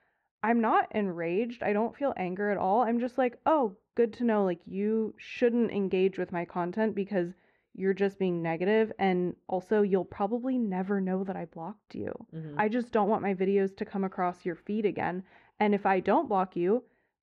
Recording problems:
muffled; very; fading above 1.5 kHz

